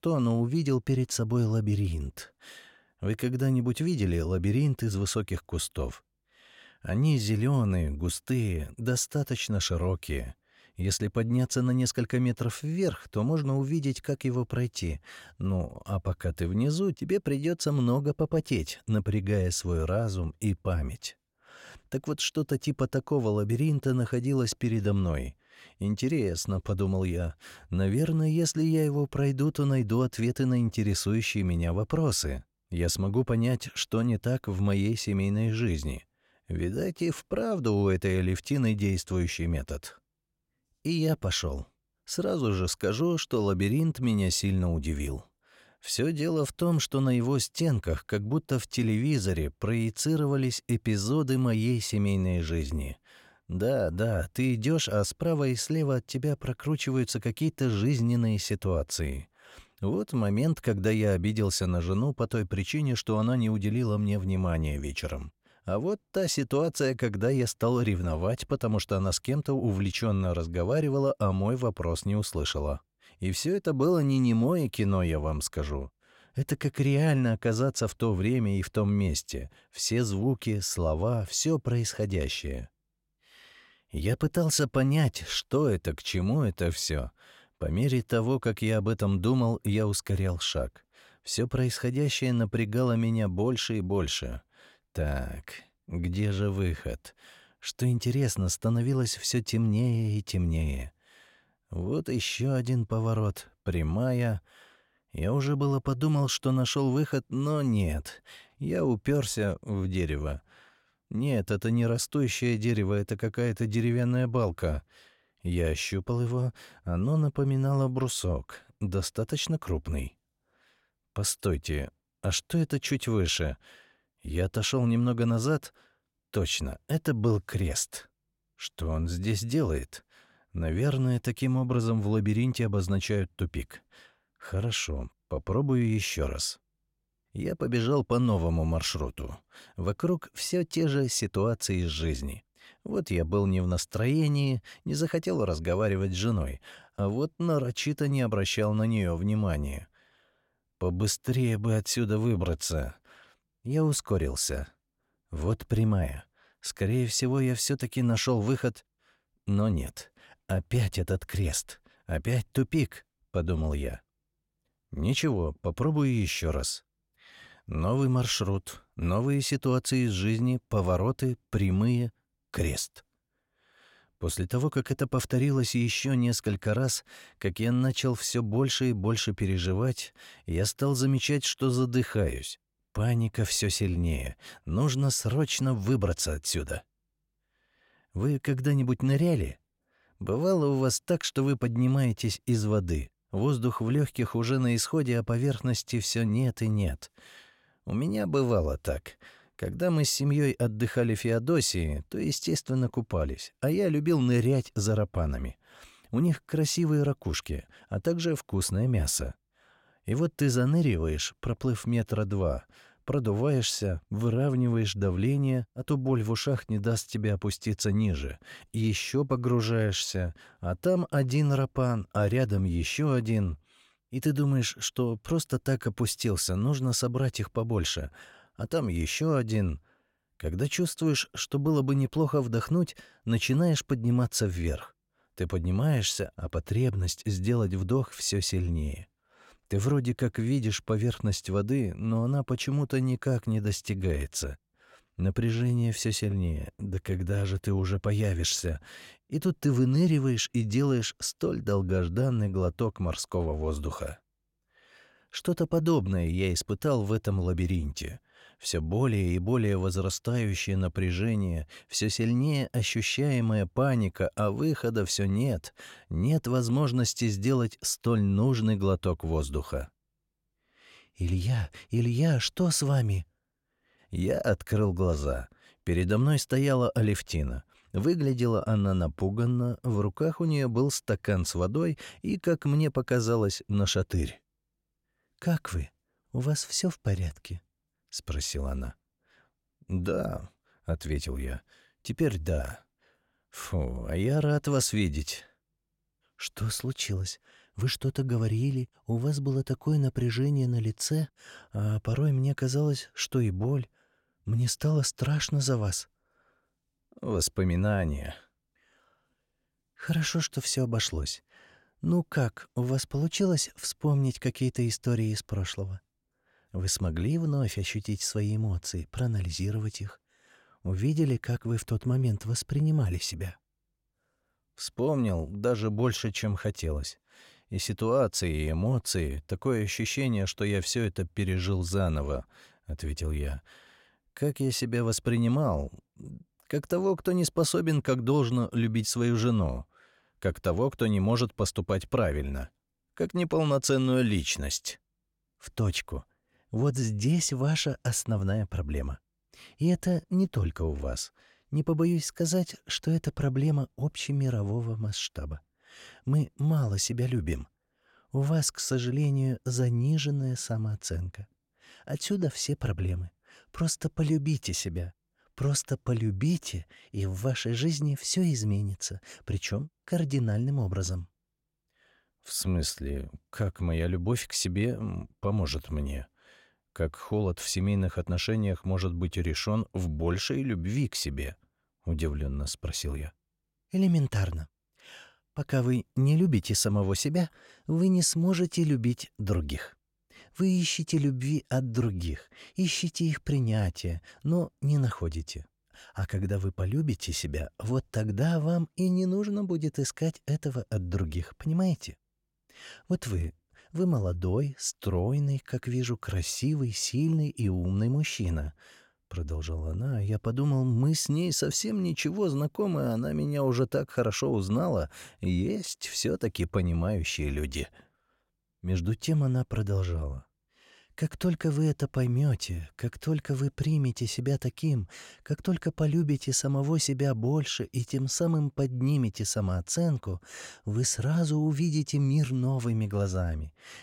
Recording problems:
none

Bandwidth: 16.5 kHz